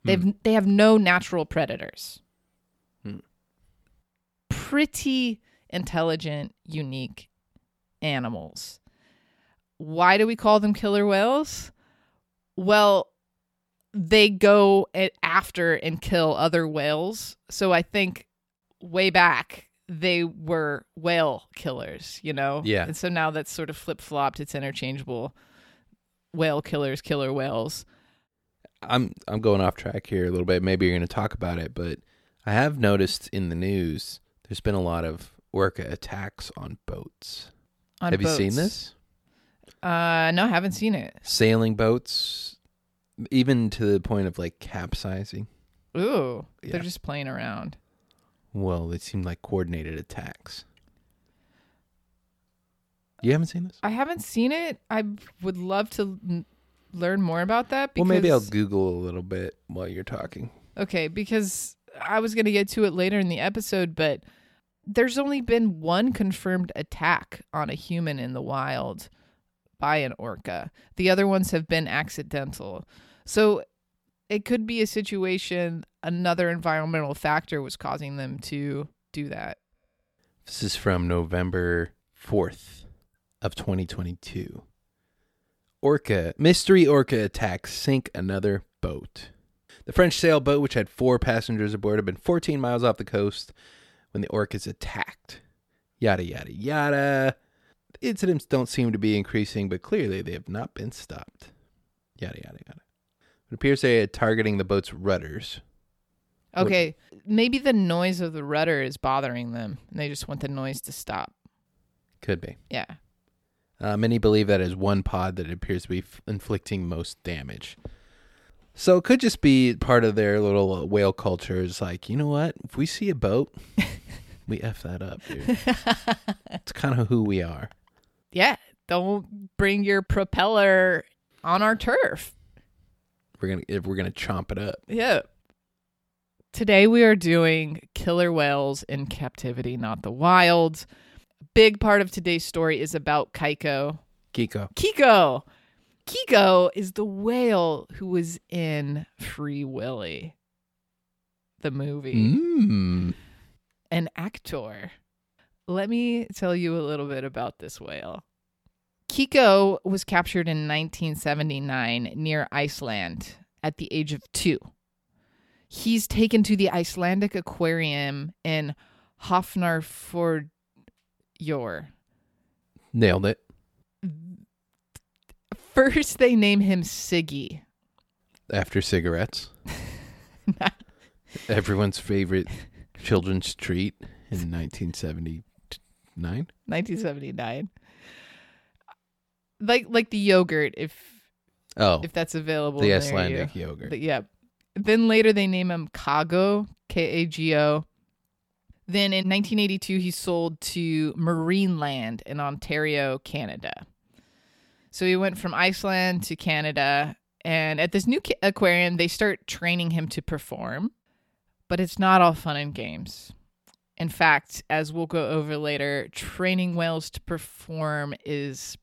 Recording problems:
none

